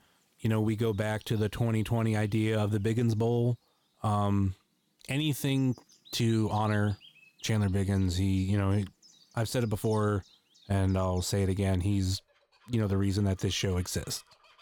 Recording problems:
animal sounds; faint; throughout; 25 dB below the speech

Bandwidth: 18.5 kHz